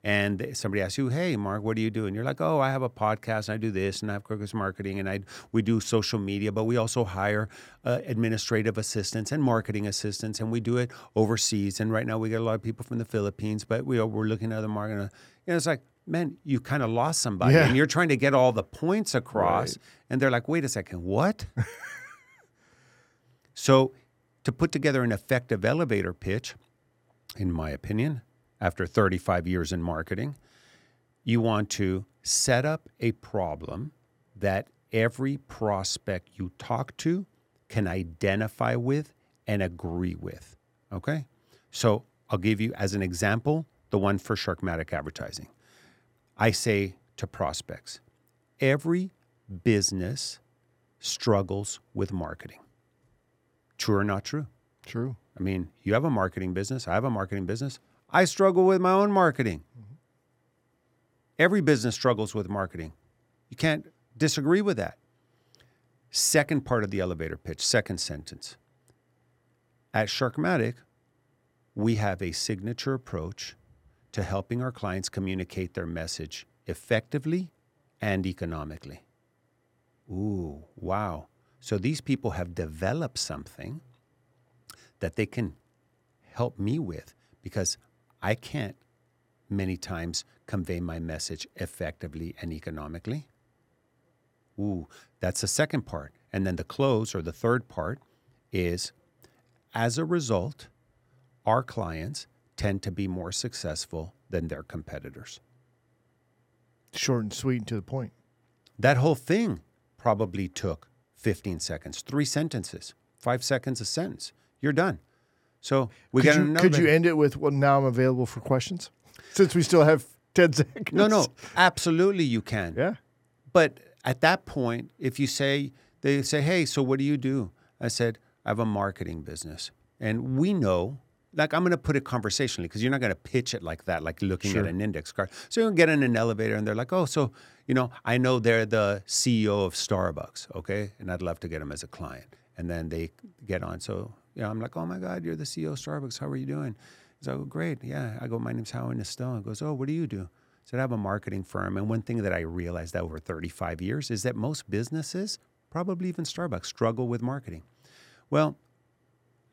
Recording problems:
none

